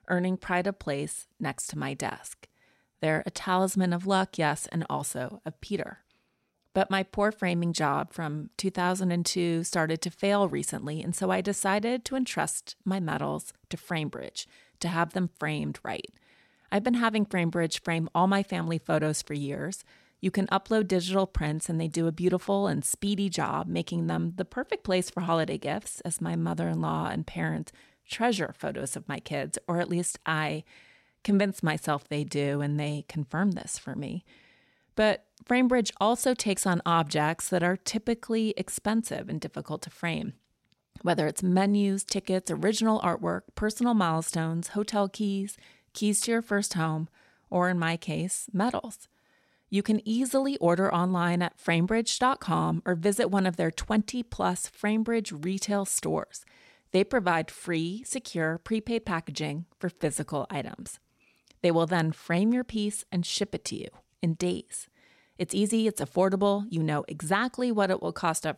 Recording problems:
none

